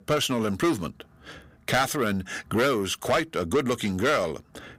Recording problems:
distortion; heavy; 6 dB below the speech

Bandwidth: 15.5 kHz